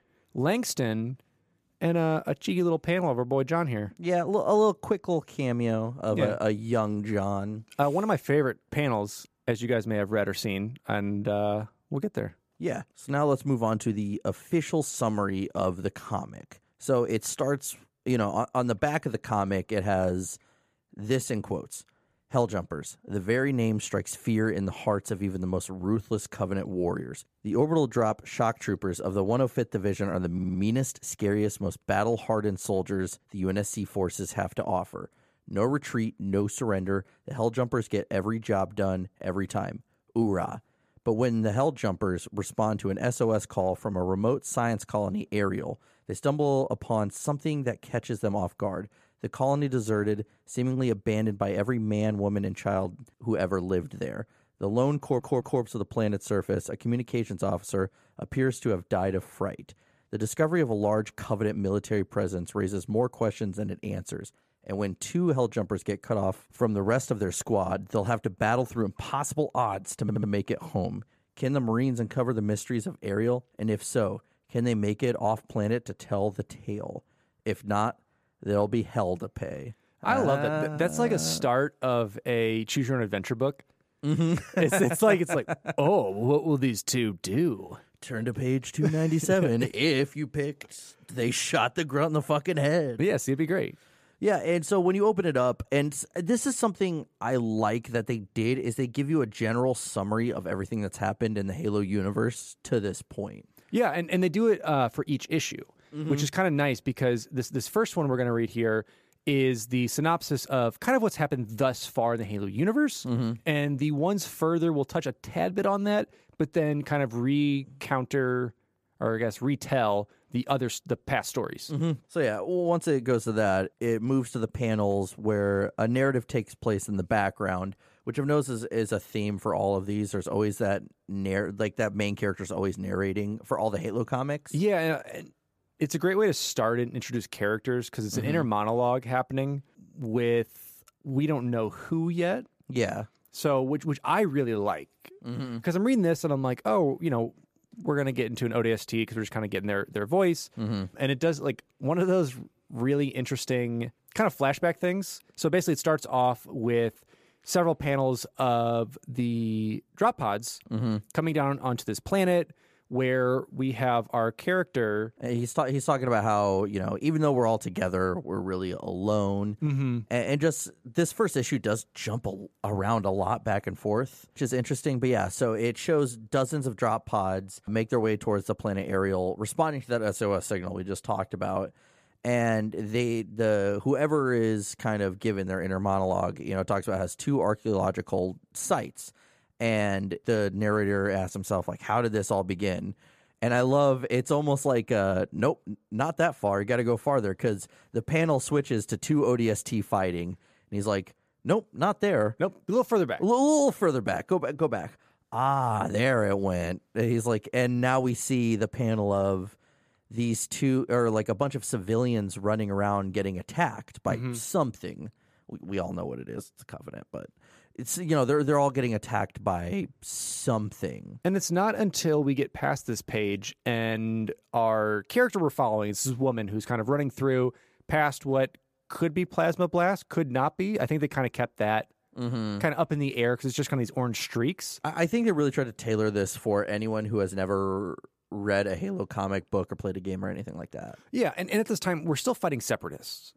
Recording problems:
audio stuttering; at 30 s, at 55 s and at 1:10

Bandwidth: 14.5 kHz